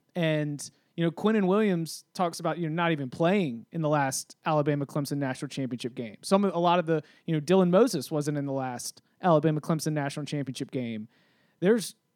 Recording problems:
none

